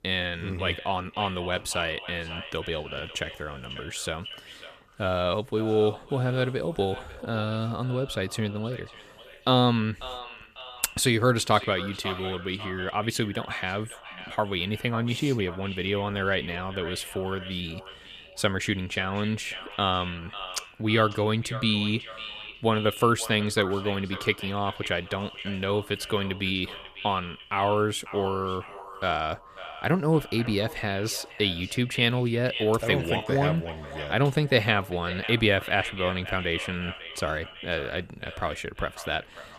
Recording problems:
echo of what is said; noticeable; throughout; 550 ms later, 15 dB below the speech

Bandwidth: 14.5 kHz